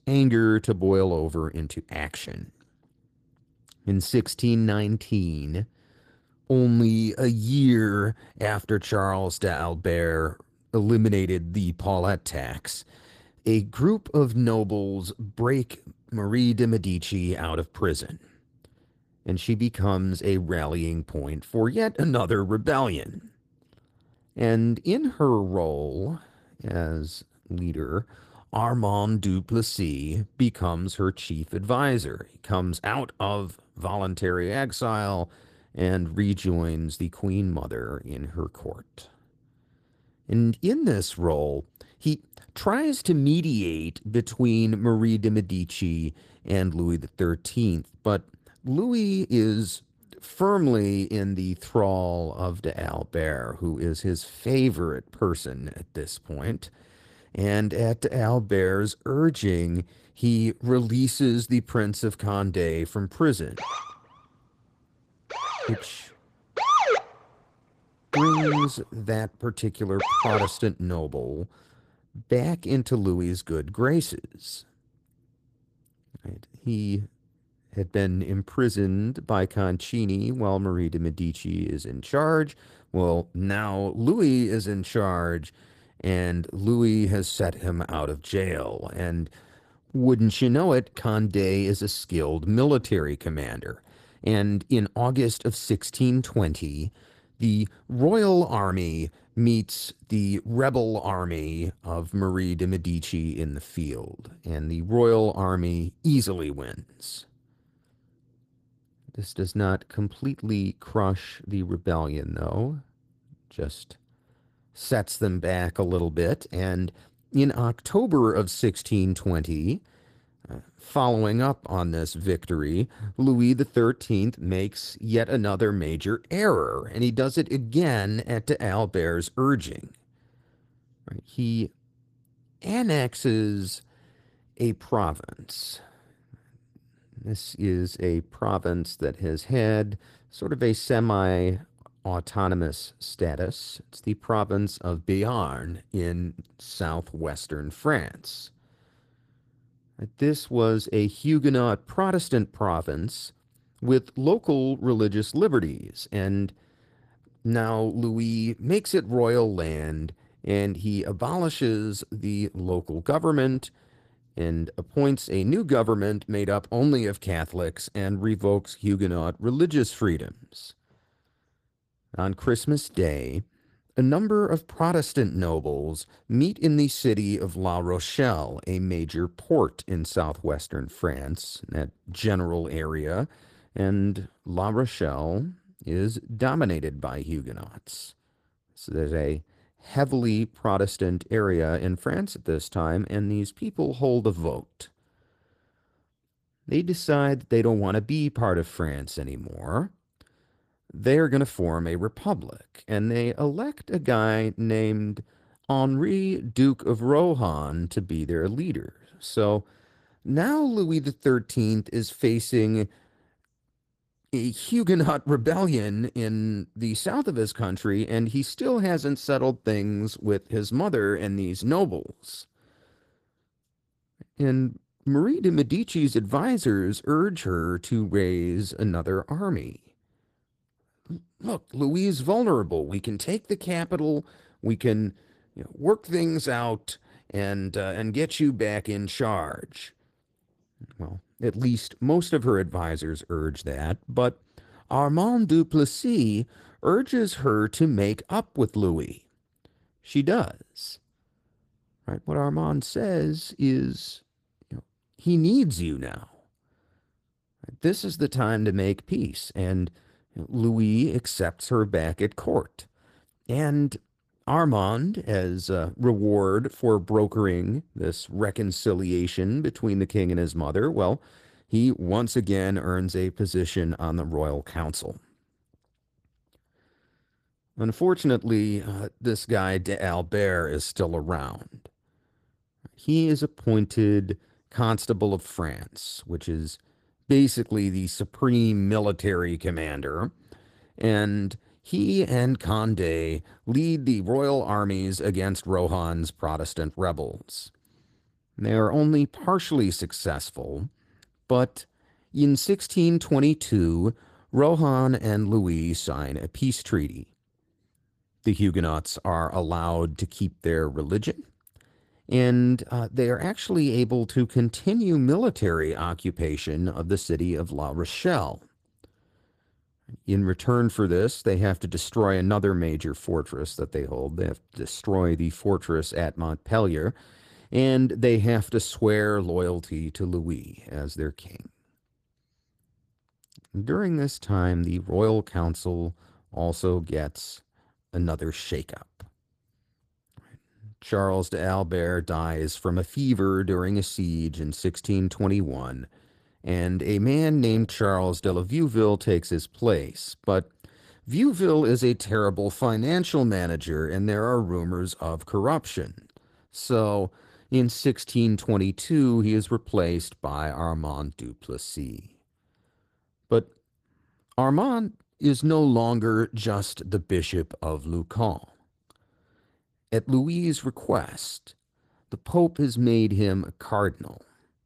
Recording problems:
garbled, watery; slightly; nothing above 14.5 kHz
siren; loud; from 1:04 to 1:10; peak 6 dB above the speech

